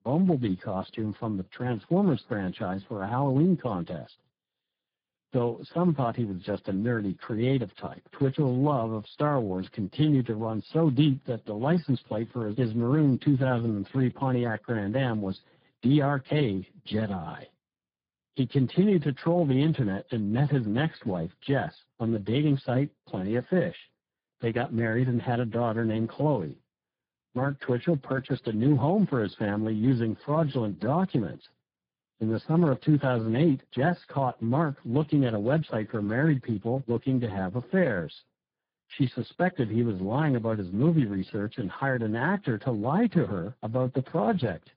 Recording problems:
garbled, watery; badly; nothing above 5 kHz

